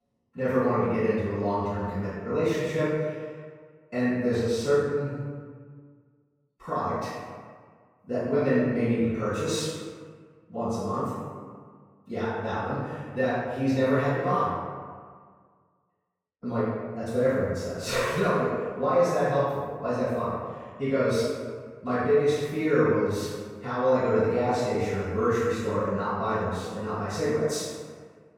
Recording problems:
room echo; strong; dies away in 1.4 s
off-mic speech; far

